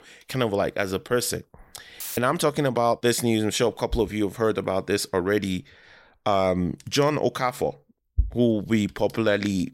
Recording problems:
audio cutting out; filled with static; at 2 s

